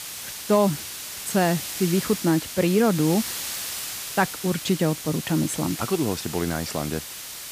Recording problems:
hiss; loud; throughout; 7 dB below the speech

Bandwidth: 15 kHz